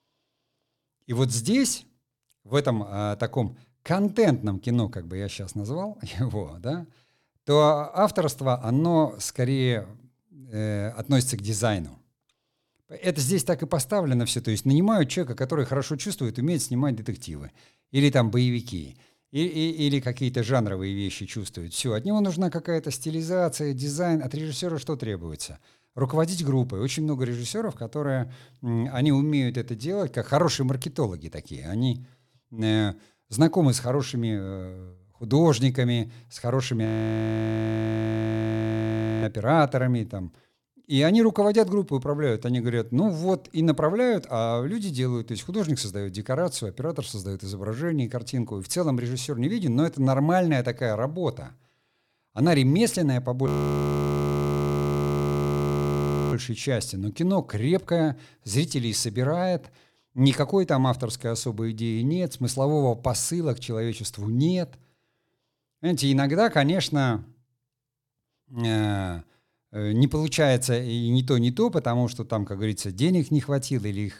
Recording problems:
audio freezing; at 37 s for 2.5 s and at 53 s for 3 s

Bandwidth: 18 kHz